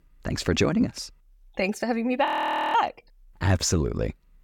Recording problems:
audio freezing; at 2.5 s

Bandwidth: 17 kHz